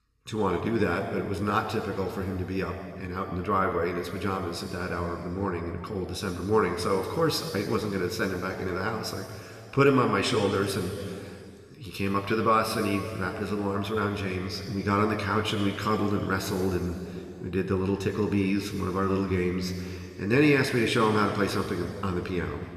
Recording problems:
room echo; noticeable; dies away in 2.4 s
off-mic speech; somewhat distant

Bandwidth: 14 kHz